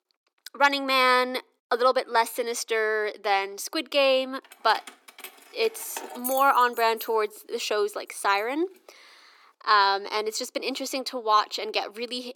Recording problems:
thin; somewhat; fading below 350 Hz
jangling keys; noticeable; from 4.5 to 7 s; peak 7 dB below the speech

